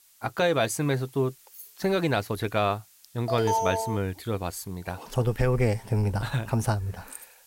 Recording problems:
hiss; faint; throughout; 25 dB below the speech
jangling keys; faint; at 1.5 s and at 7 s; peak 15 dB below the speech
alarm; loud; at 3.5 s; peak 1 dB above the speech

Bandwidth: 16 kHz